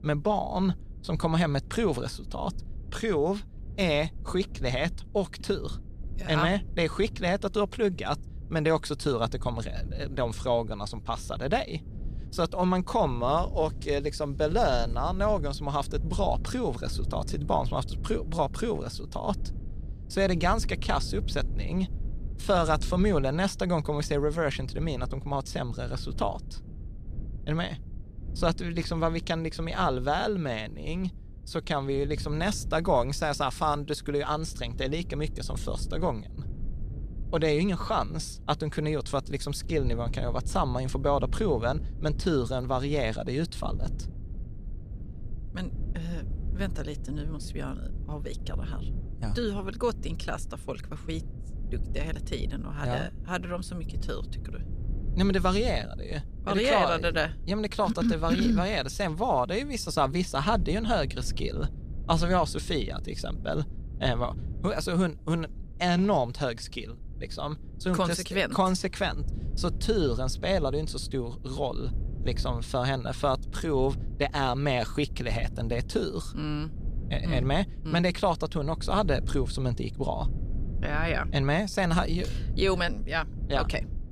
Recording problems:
low rumble; faint; throughout; 20 dB below the speech

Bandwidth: 14 kHz